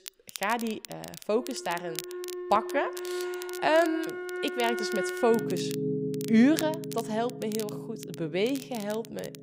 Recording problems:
background music; loud; throughout; 6 dB below the speech
crackle, like an old record; noticeable; 15 dB below the speech

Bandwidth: 15.5 kHz